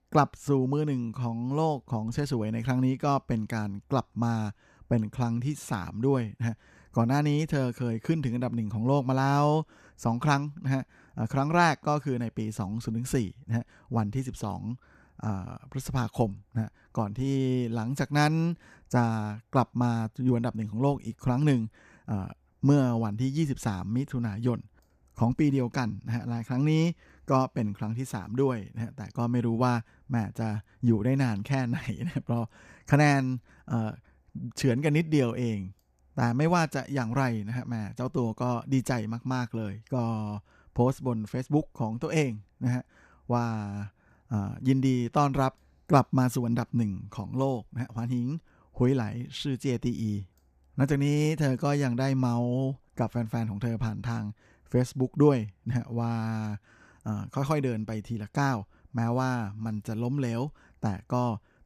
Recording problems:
none

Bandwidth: 14.5 kHz